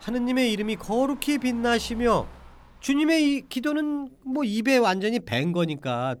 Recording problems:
traffic noise; faint; throughout; 20 dB below the speech

